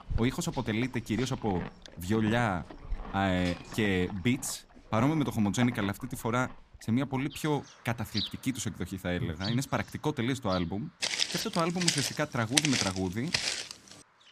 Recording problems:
animal sounds; noticeable; throughout; 10 dB below the speech
footsteps; loud; from 11 to 14 s; peak 5 dB above the speech

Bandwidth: 15 kHz